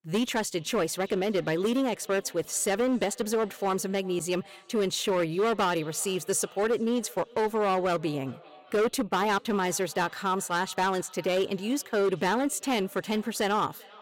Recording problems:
echo of what is said; faint; throughout; 390 ms later, 25 dB below the speech
distortion; slight; 10% of the sound clipped

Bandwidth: 16.5 kHz